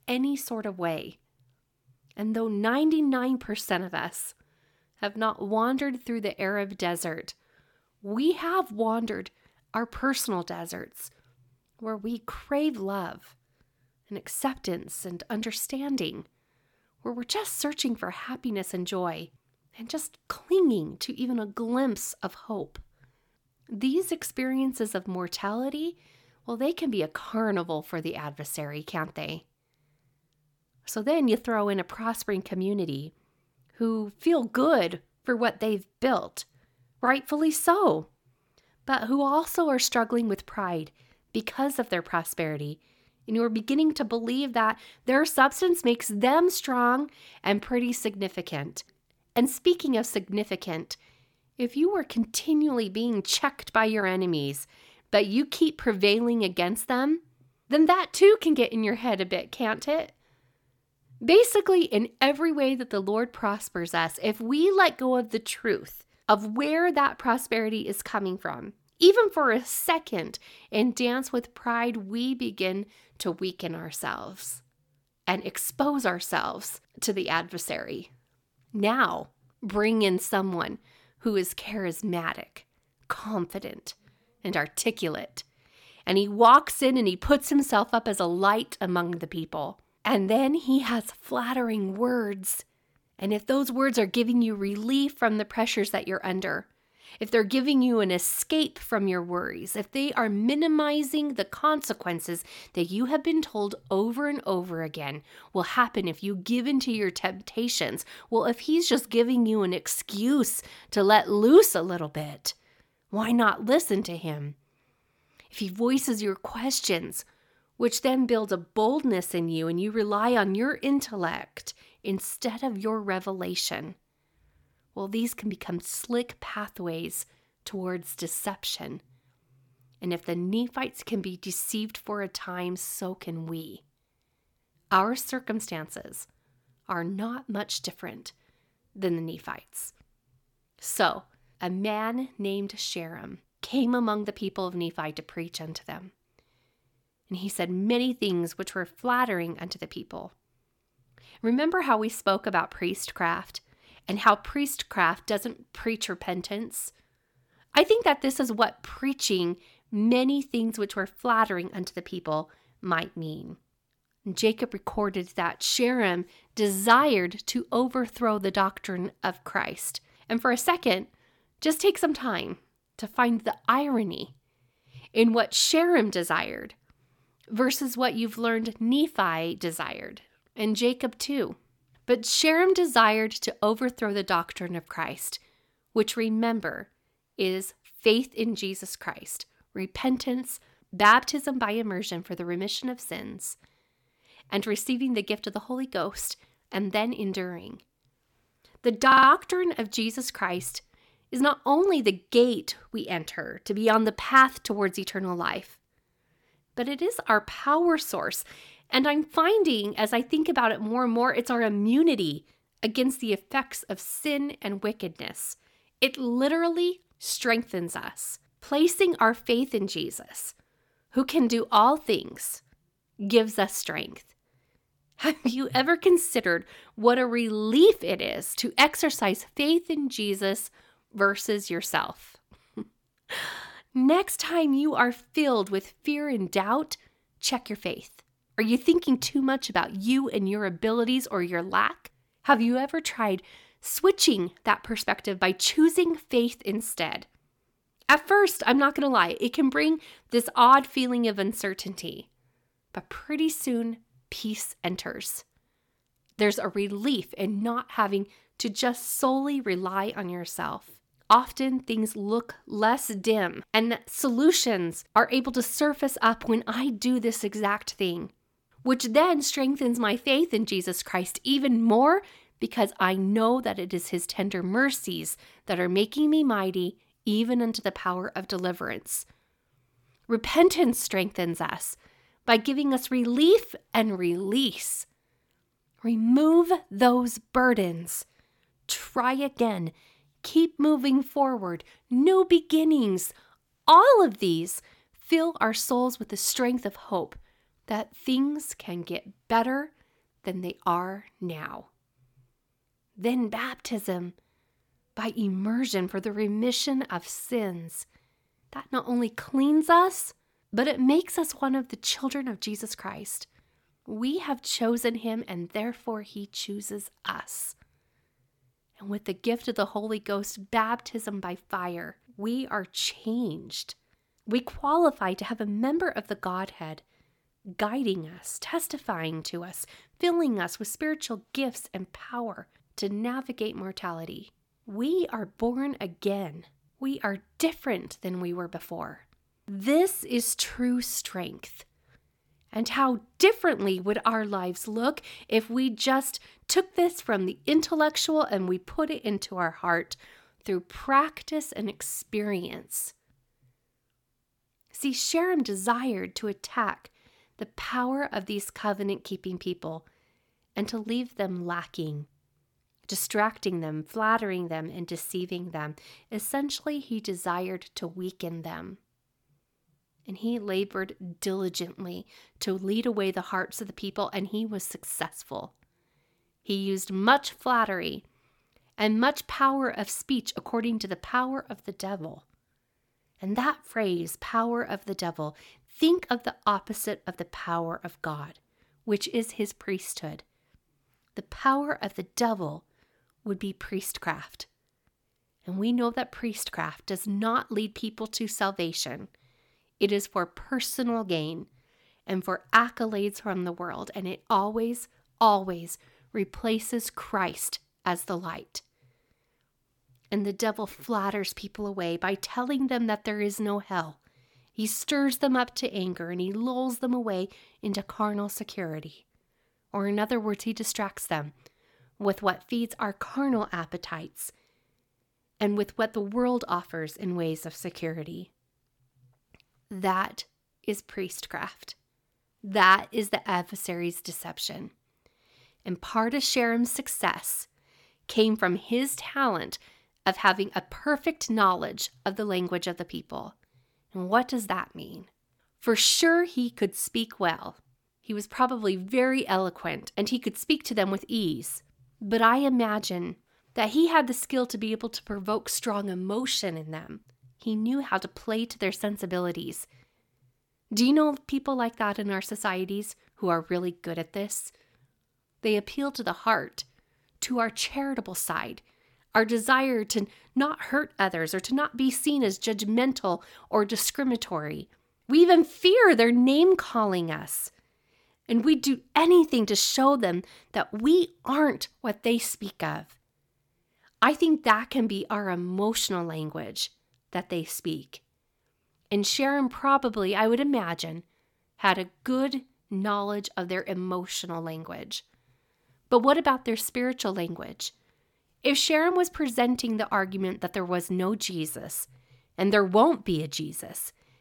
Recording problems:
audio stuttering; at 3:19

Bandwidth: 18 kHz